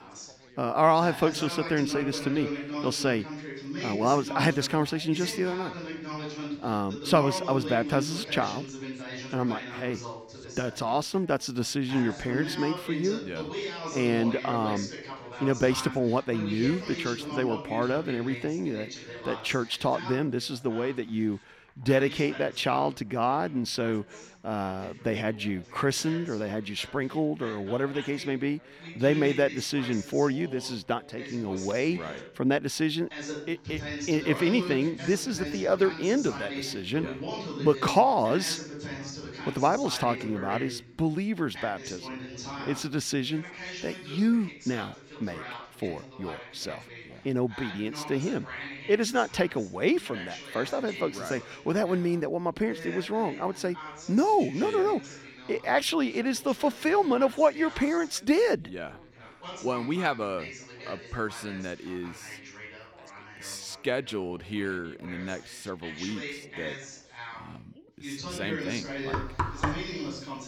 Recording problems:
background chatter; noticeable; throughout; 3 voices, 10 dB below the speech
door banging; noticeable; at 1:09; peak 2 dB below the speech

